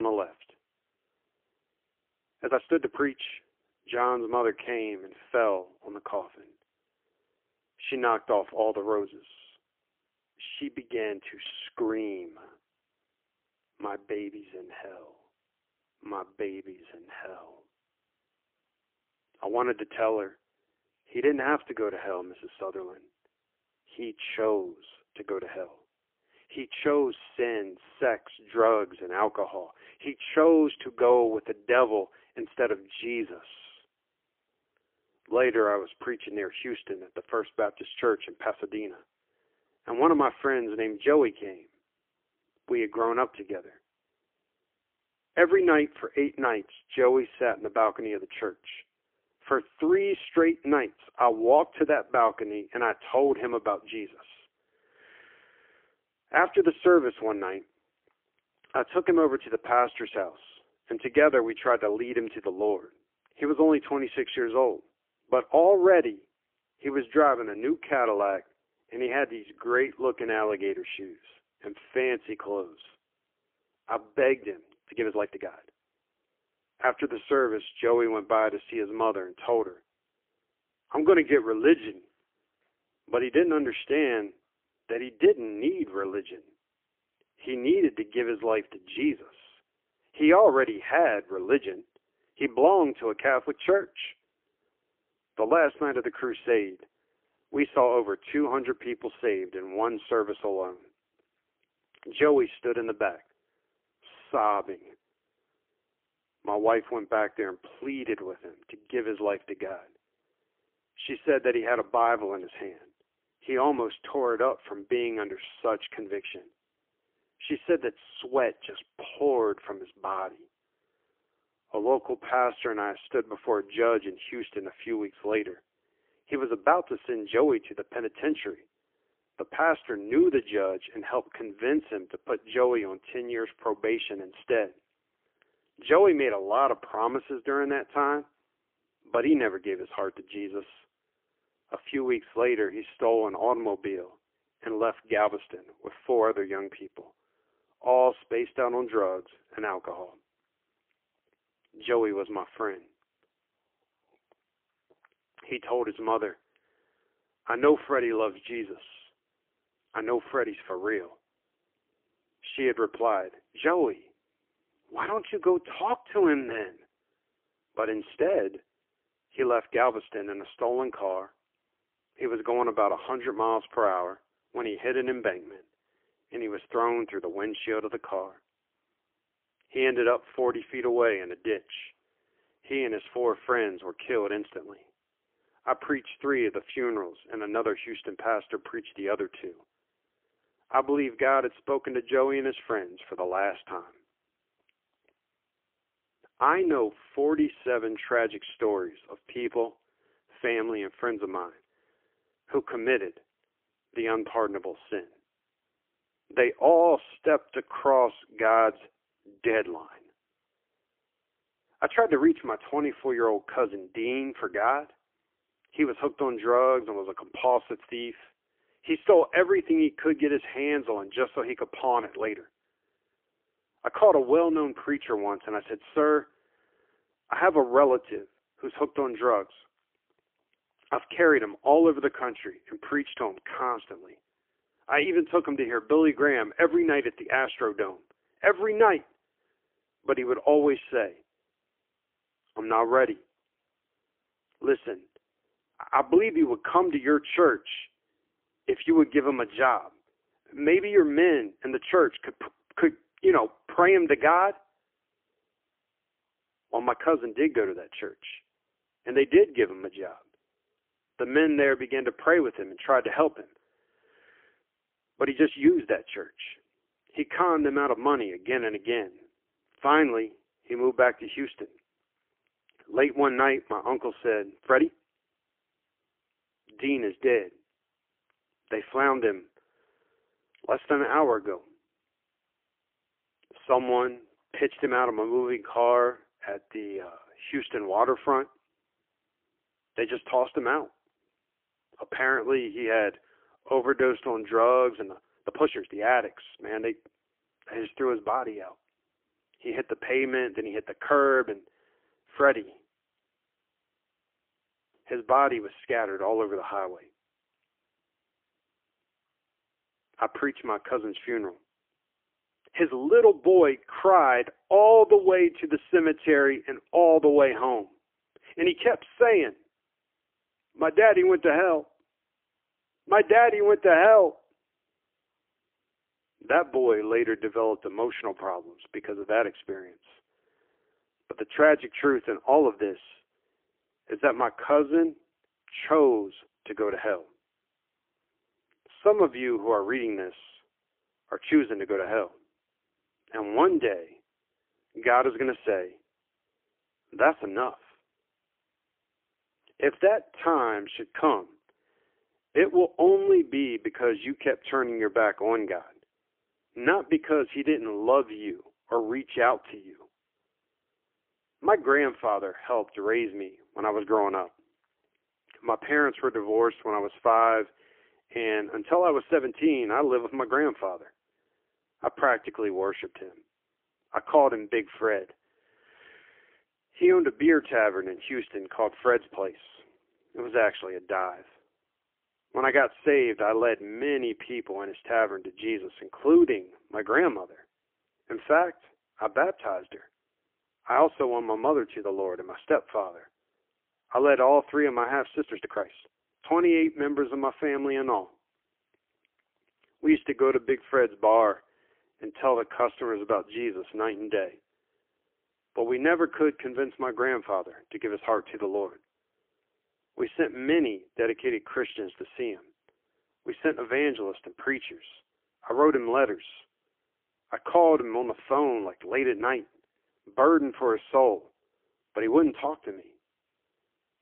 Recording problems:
phone-call audio; poor line; nothing above 3.5 kHz
abrupt cut into speech; at the start
uneven, jittery; strongly; from 2.5 s to 6:43

